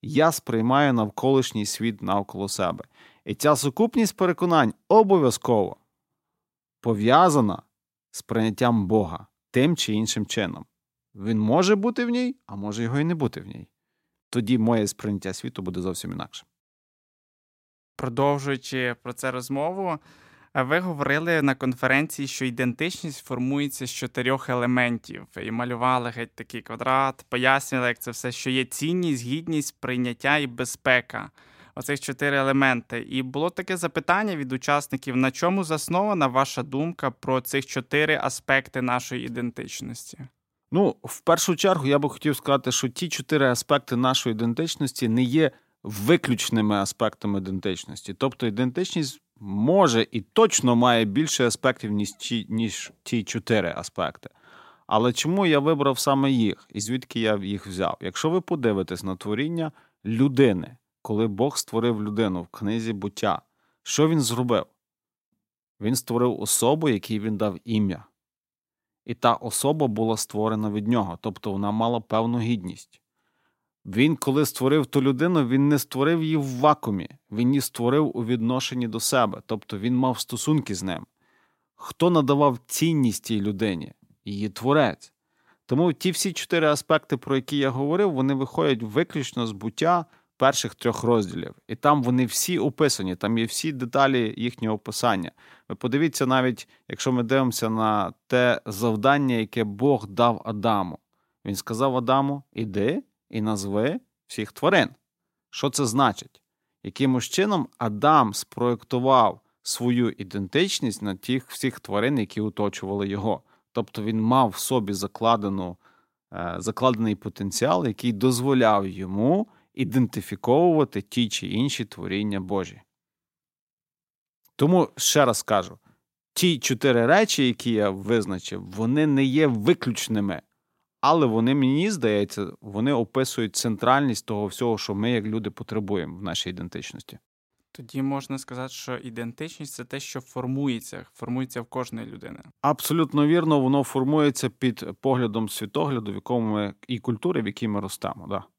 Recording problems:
none

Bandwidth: 16 kHz